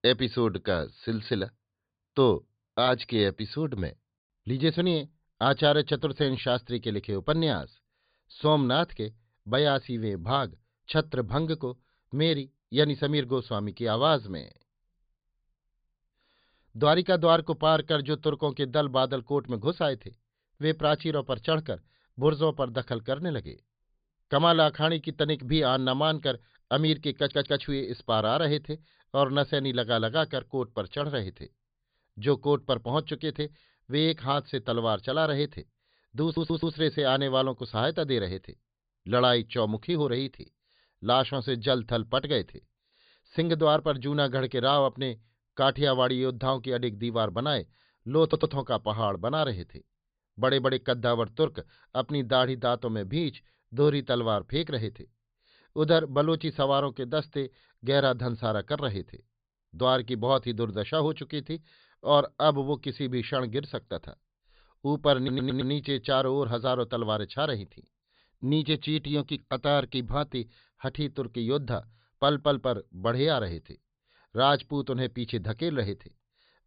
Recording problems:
high frequencies cut off; severe; nothing above 5 kHz
audio stuttering; 4 times, first at 27 s

